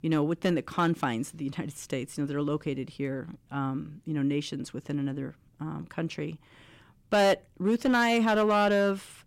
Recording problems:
distortion; slight; 4% of the sound clipped

